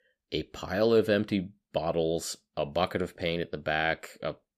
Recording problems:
none

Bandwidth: 15 kHz